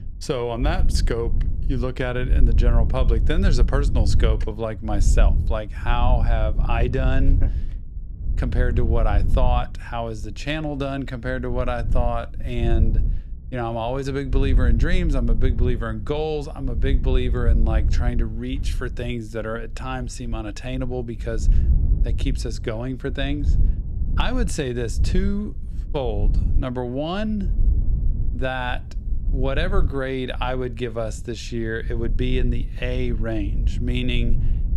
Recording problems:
wind noise on the microphone; occasional gusts; 15 dB below the speech

